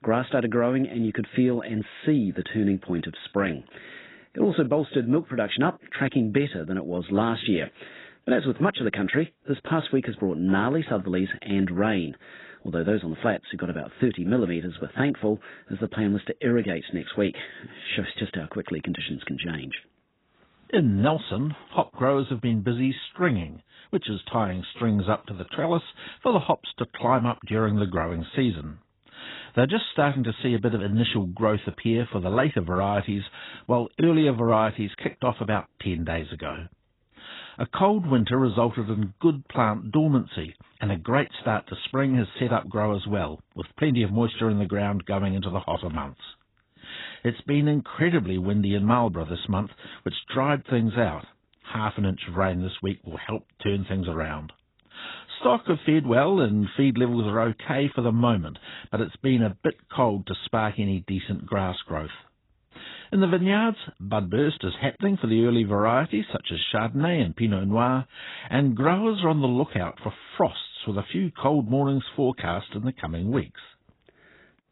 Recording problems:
garbled, watery; badly; nothing above 4 kHz

